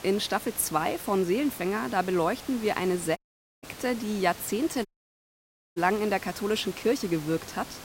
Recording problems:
hiss; noticeable; throughout; 15 dB below the speech
audio cutting out; at 3 s and at 5 s for 1 s

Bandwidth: 16 kHz